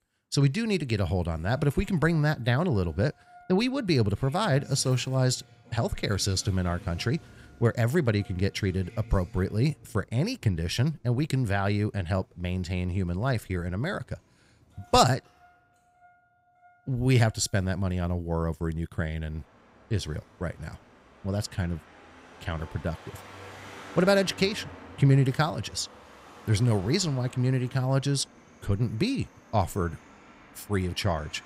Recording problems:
traffic noise; faint; throughout; 20 dB below the speech

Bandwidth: 15.5 kHz